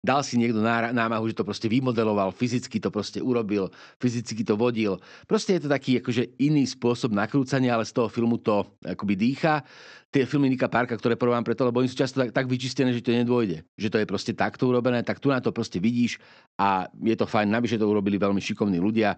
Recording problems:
high frequencies cut off; noticeable; nothing above 8 kHz

